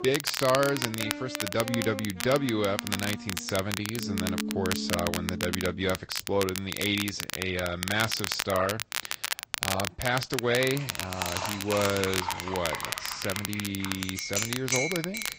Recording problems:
garbled, watery; slightly; nothing above 15.5 kHz
background music; loud; until 6 s; 8 dB below the speech
household noises; loud; from 11 s on; 5 dB below the speech
crackle, like an old record; loud; 3 dB below the speech

